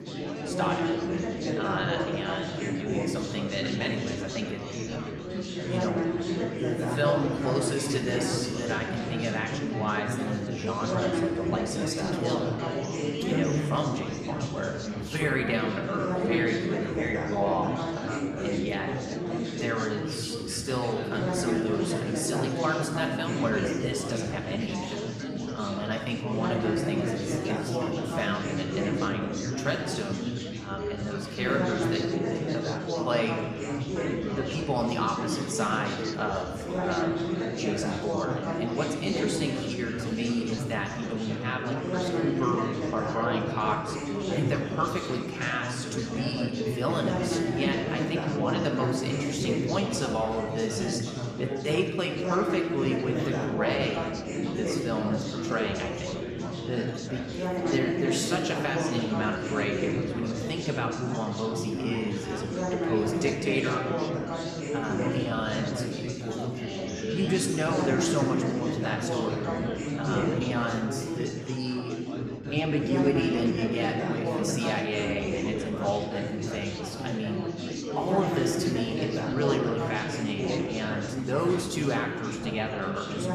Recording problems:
room echo; slight; dies away in 1.1 s
off-mic speech; somewhat distant
chatter from many people; very loud; throughout; as loud as the speech

